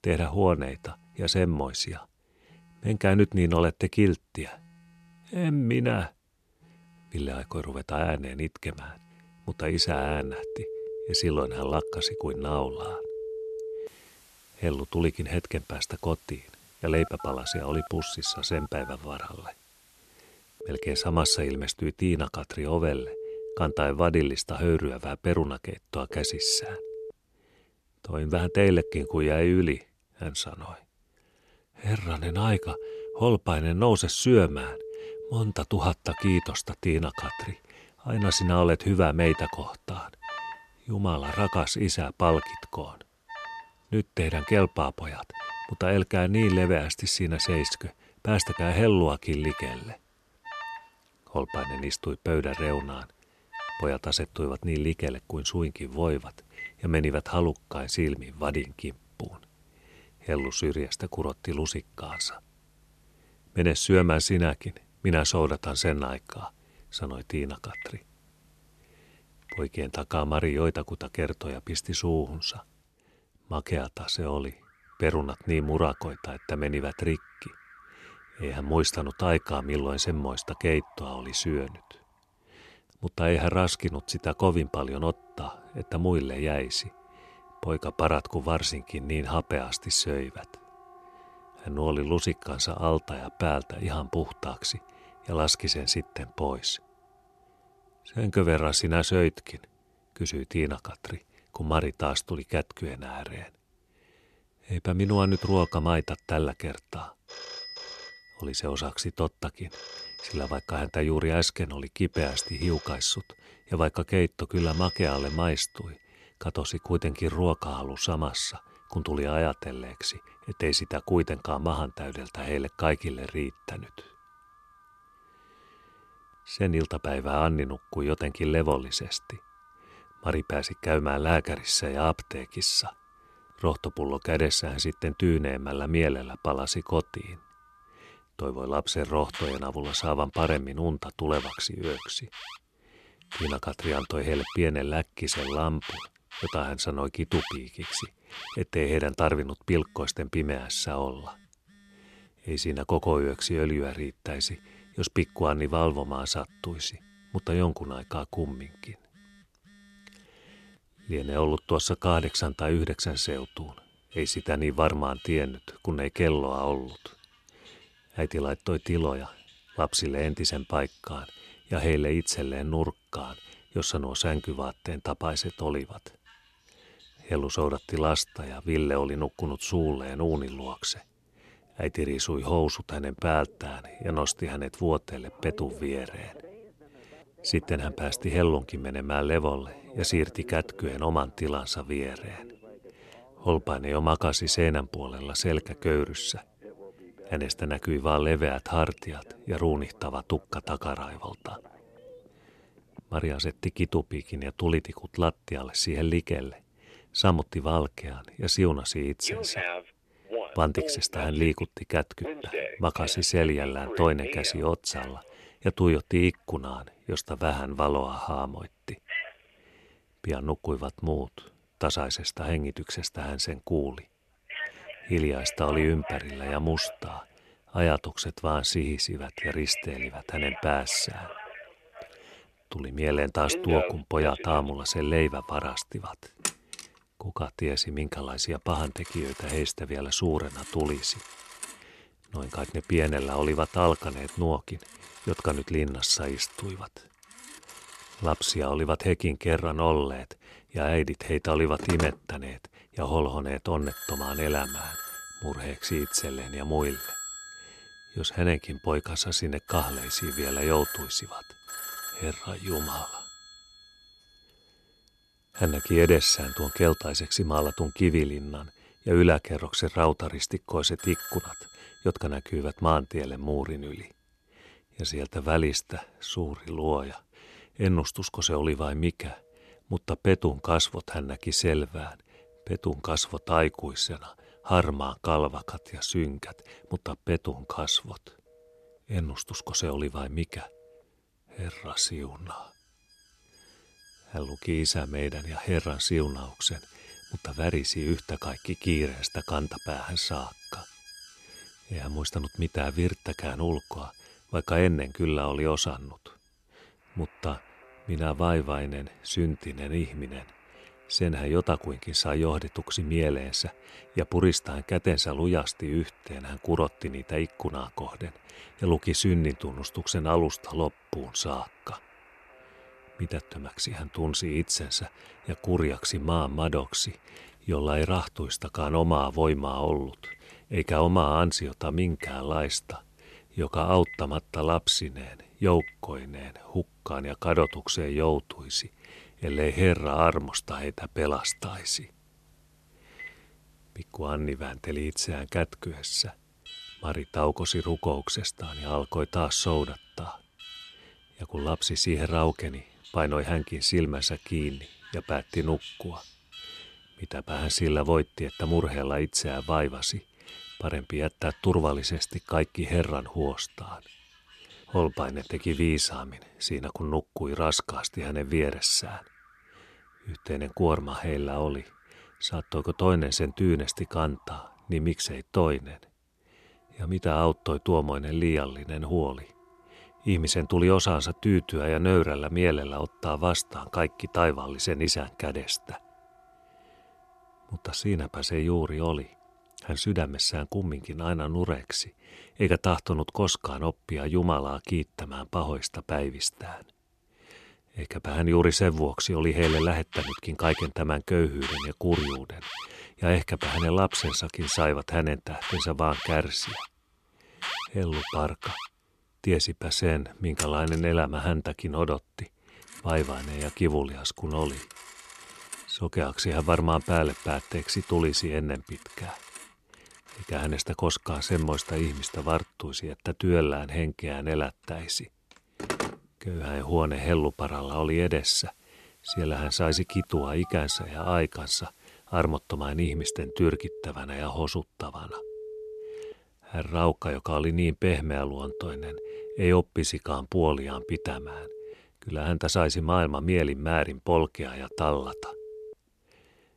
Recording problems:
alarms or sirens; noticeable; throughout; 10 dB below the speech

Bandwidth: 13.5 kHz